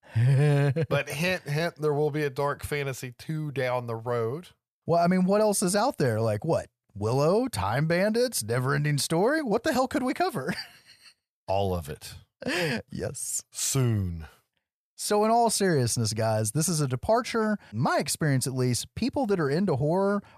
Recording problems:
none

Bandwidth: 14.5 kHz